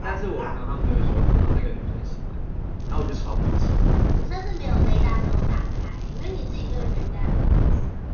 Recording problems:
off-mic speech; far
room echo; noticeable; dies away in 0.5 s
high frequencies cut off; noticeable; nothing above 6.5 kHz
animal sounds; very loud; until 2 s; as loud as the speech
wind noise on the microphone; heavy; 2 dB above the speech
crackling; noticeable; at 3 s and from 3.5 to 7 s; 15 dB below the speech

